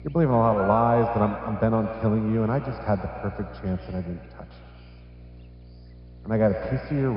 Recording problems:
echo of what is said; strong; throughout; 110 ms later, 9 dB below the speech
high frequencies cut off; noticeable; nothing above 5.5 kHz
muffled; very slightly; fading above 1.5 kHz
electrical hum; noticeable; throughout; 60 Hz, 20 dB below the speech
abrupt cut into speech; at the end

